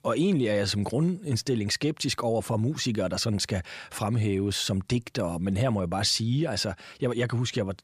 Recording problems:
none

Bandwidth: 15 kHz